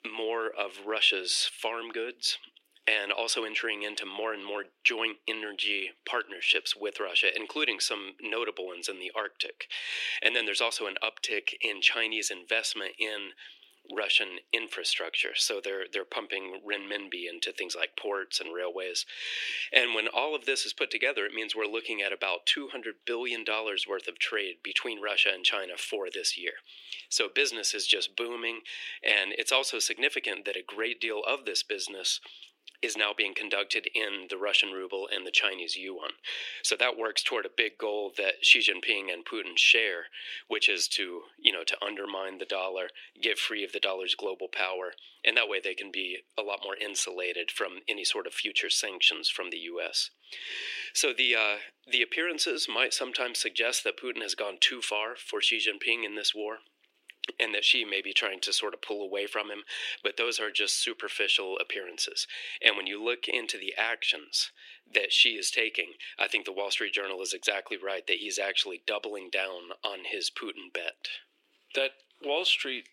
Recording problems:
thin; very; fading below 350 Hz

